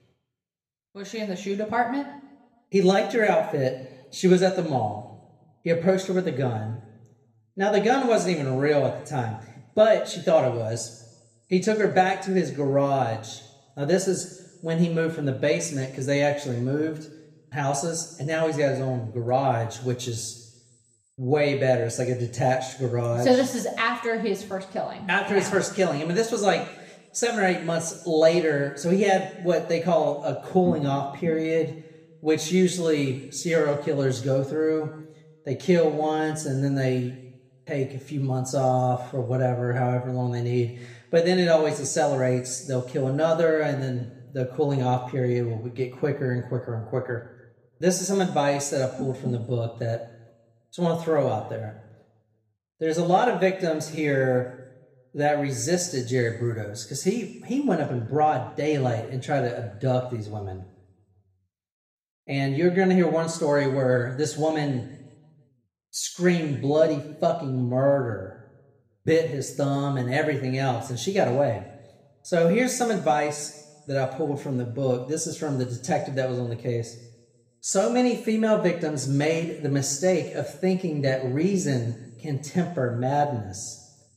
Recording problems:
room echo; slight; dies away in 0.9 s
off-mic speech; somewhat distant

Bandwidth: 15 kHz